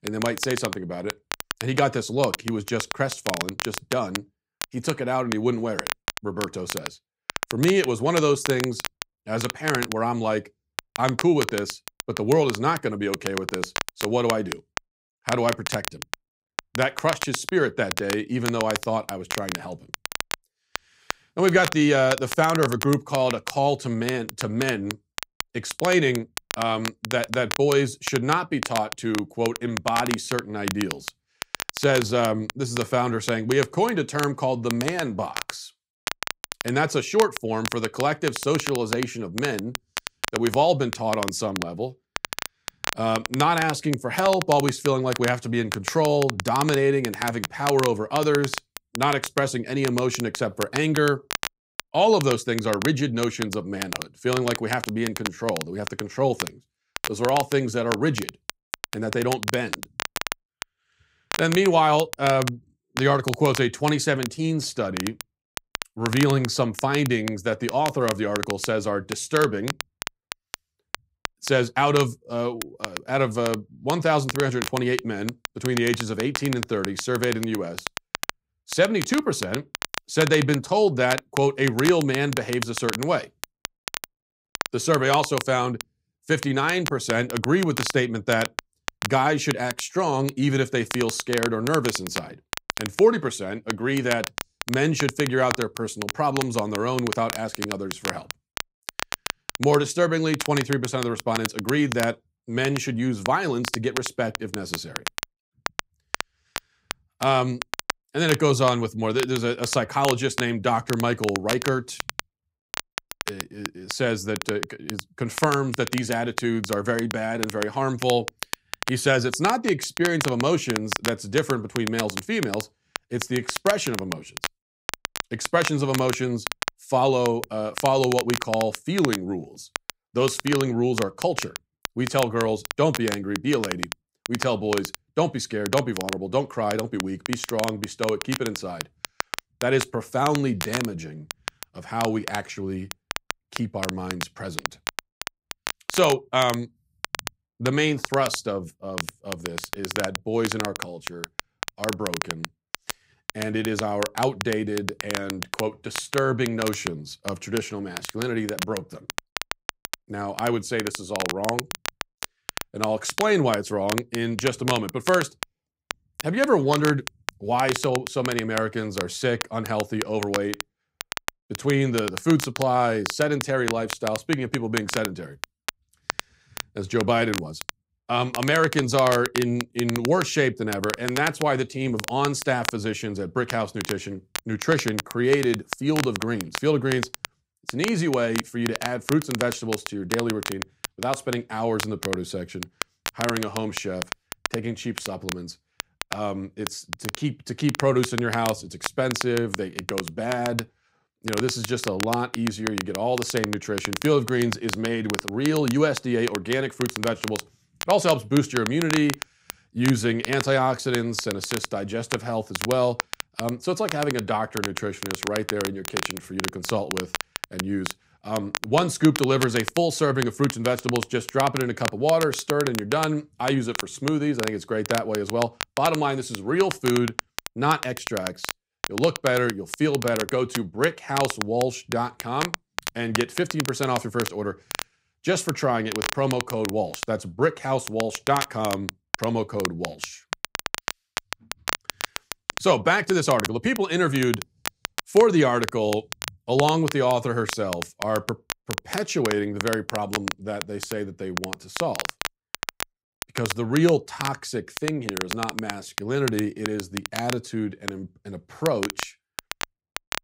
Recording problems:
crackle, like an old record; loud; 8 dB below the speech

